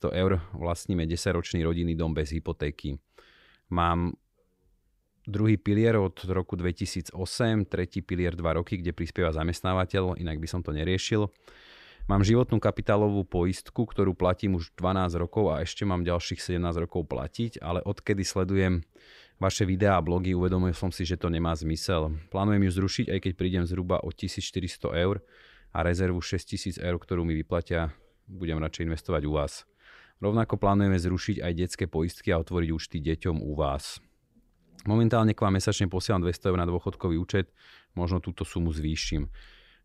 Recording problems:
none

